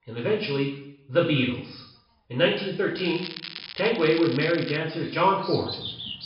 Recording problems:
room echo; noticeable; dies away in 0.7 s
high frequencies cut off; noticeable; nothing above 5.5 kHz
off-mic speech; somewhat distant
animal sounds; noticeable; throughout; 10 dB below the speech
crackling; noticeable; from 3 to 5 s; 10 dB below the speech

